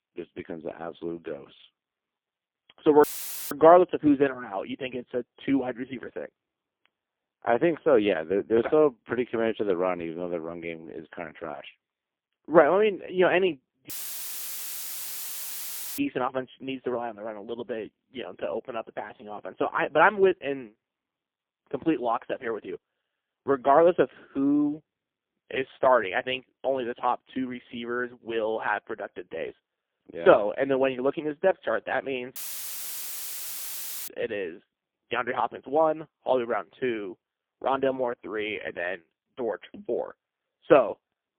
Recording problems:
phone-call audio; poor line; nothing above 3 kHz
audio cutting out; filled with static; at 3 s, at 14 s for 2 s and at 32 s for 1.5 s

